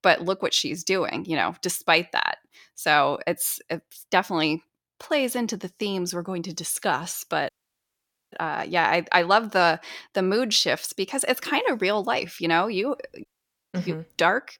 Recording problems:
audio cutting out; at 7.5 s for 1 s and at 13 s

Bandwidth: 17.5 kHz